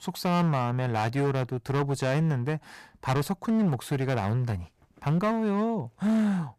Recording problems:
distortion; slight; 16% of the sound clipped

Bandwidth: 14.5 kHz